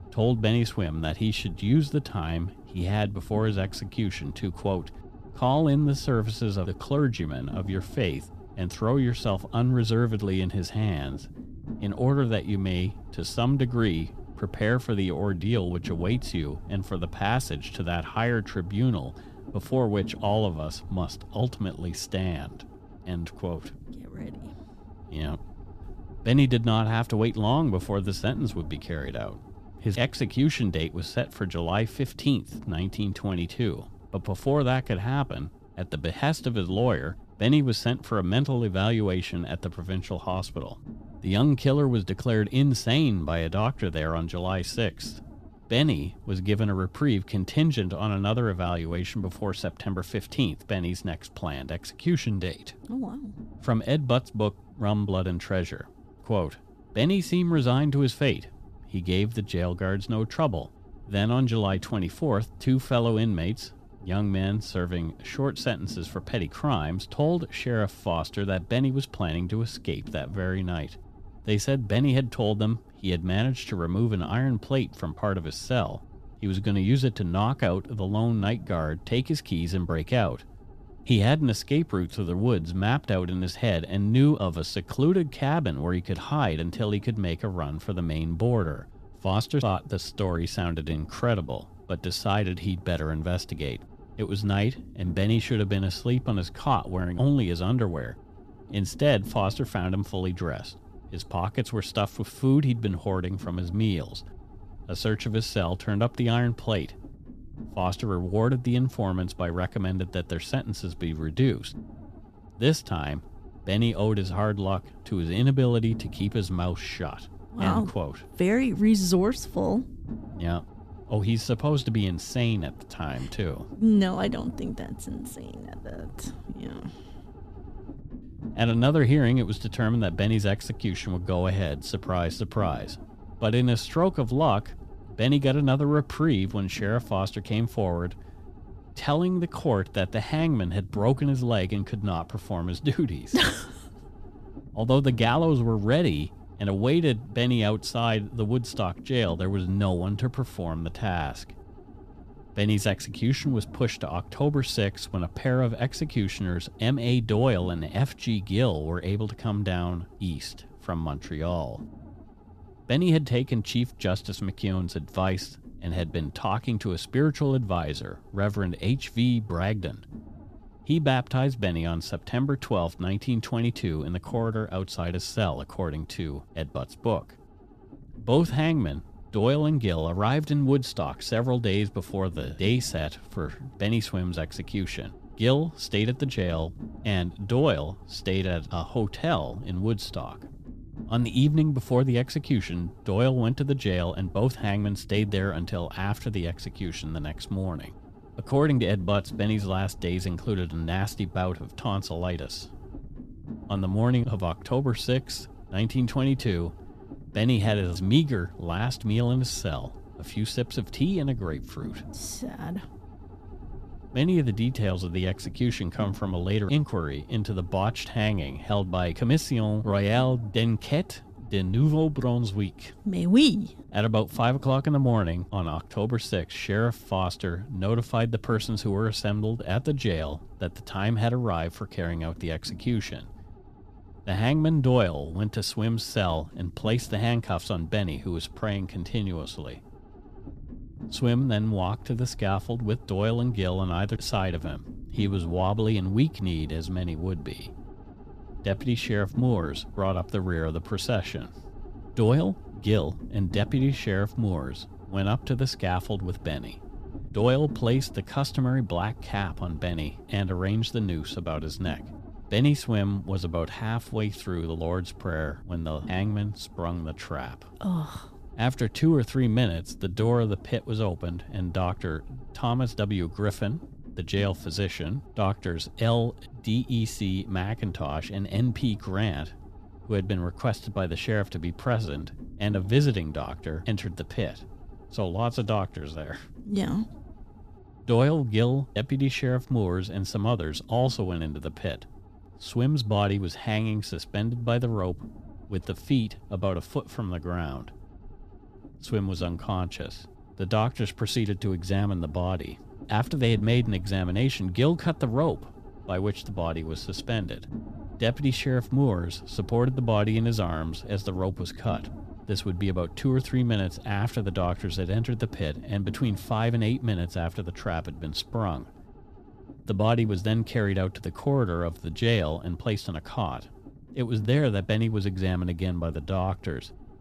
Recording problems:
low rumble; faint; throughout; 20 dB below the speech

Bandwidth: 14.5 kHz